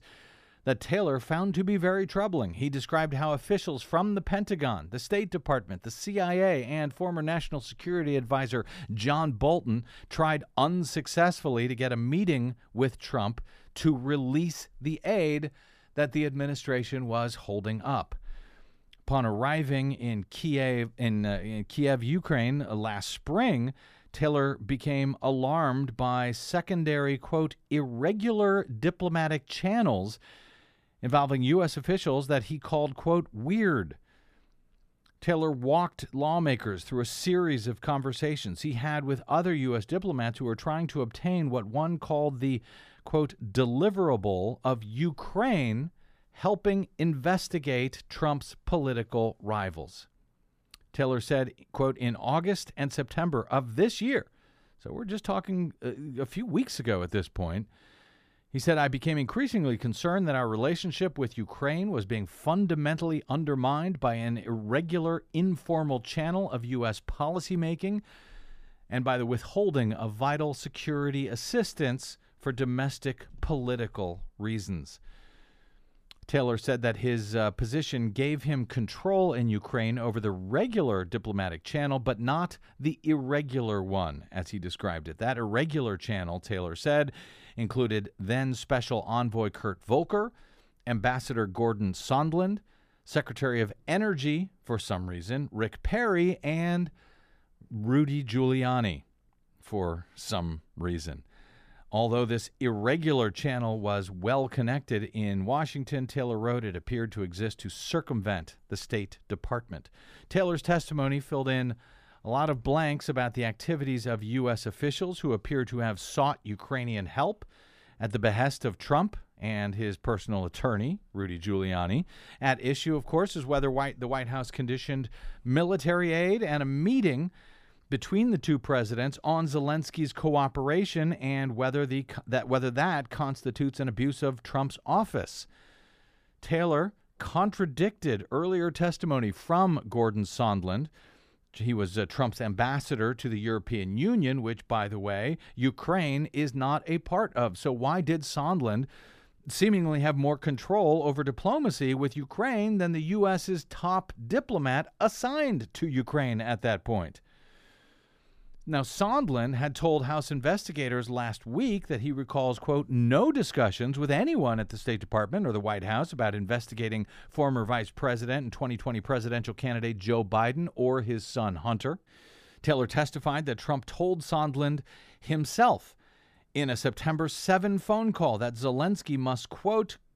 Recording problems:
none

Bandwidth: 14.5 kHz